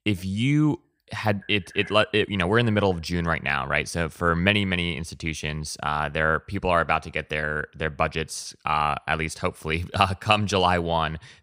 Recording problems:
none

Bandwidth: 15.5 kHz